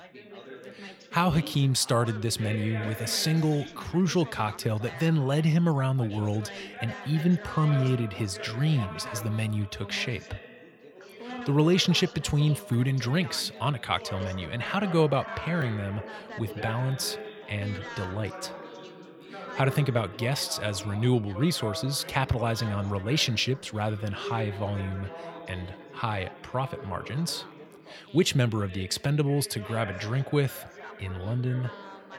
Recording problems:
background chatter; noticeable; throughout; 3 voices, 15 dB below the speech

